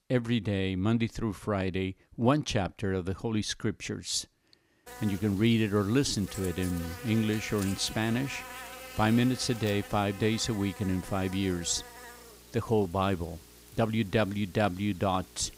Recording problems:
electrical hum; noticeable; from 5 s on; 60 Hz, 15 dB below the speech

